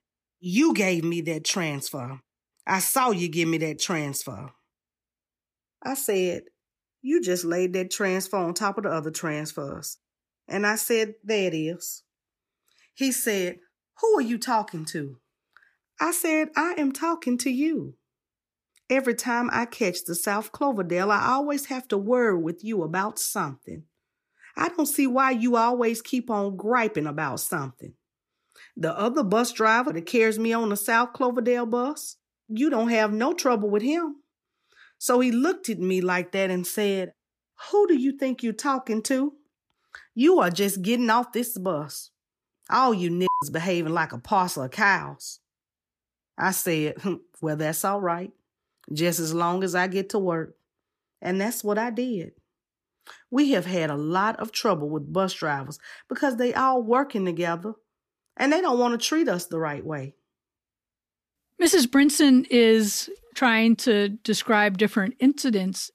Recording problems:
none

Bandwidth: 14.5 kHz